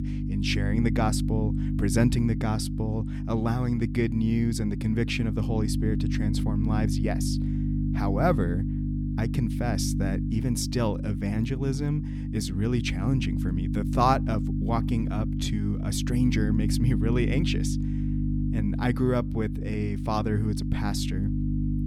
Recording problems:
electrical hum; loud; throughout; 50 Hz, 6 dB below the speech

